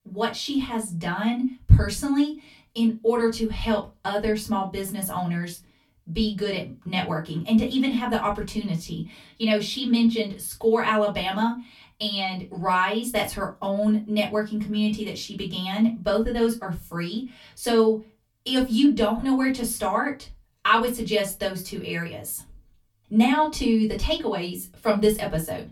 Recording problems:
off-mic speech; far
room echo; very slight; dies away in 0.2 s

